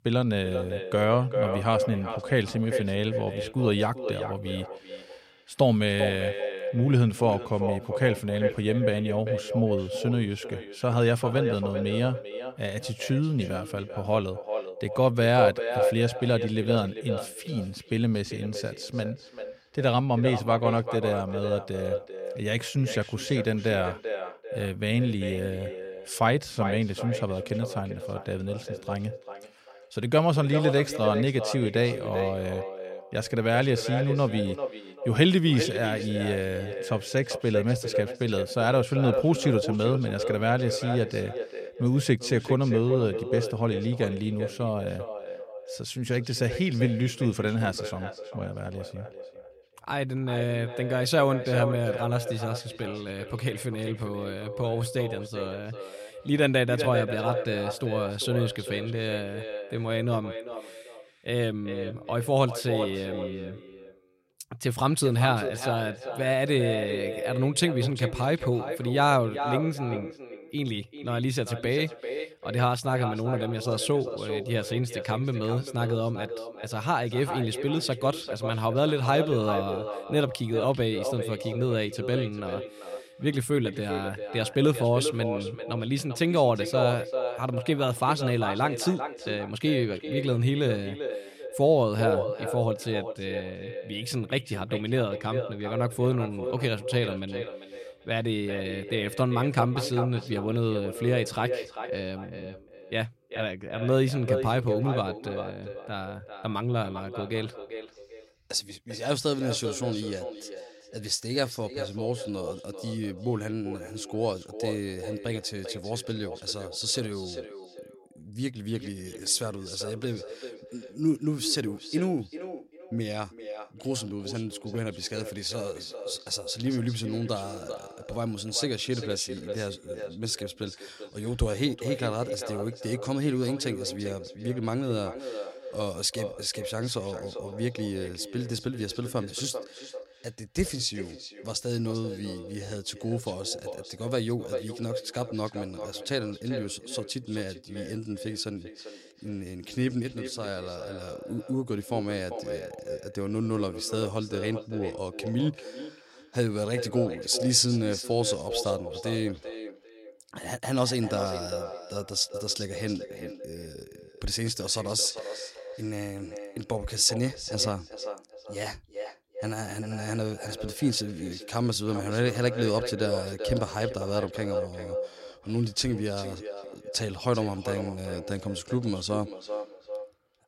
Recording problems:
echo of what is said; strong; throughout; 390 ms later, 7 dB below the speech

